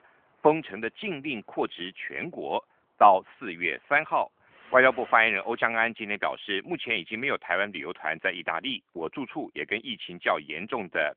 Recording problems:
phone-call audio; nothing above 3.5 kHz
traffic noise; faint; until 5.5 s; 25 dB below the speech

